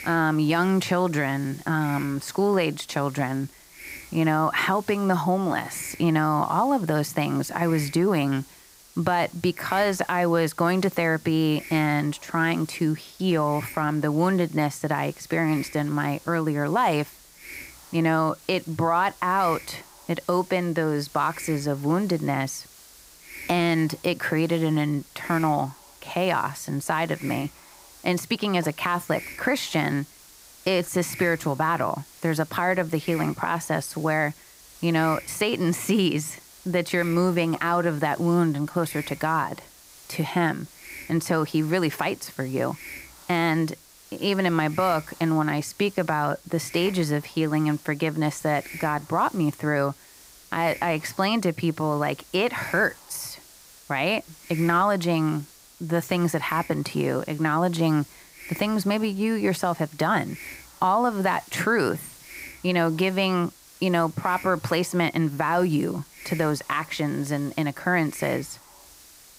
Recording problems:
hiss; noticeable; throughout; 20 dB below the speech

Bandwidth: 15.5 kHz